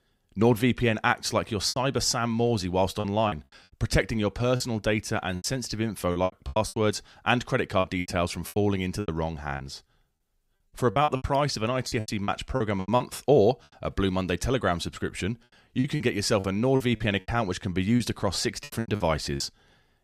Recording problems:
choppy; very; 11% of the speech affected

